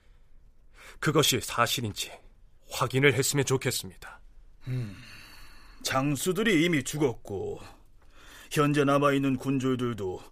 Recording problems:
none

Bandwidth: 15 kHz